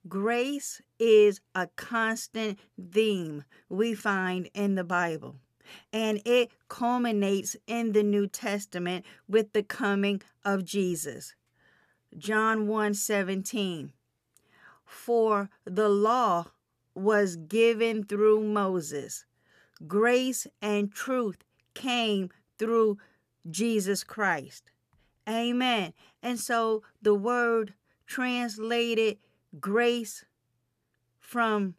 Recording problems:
none

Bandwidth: 14.5 kHz